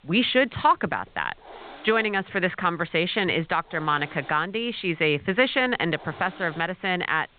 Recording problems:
high frequencies cut off; severe; nothing above 4 kHz
hiss; faint; throughout; 20 dB below the speech

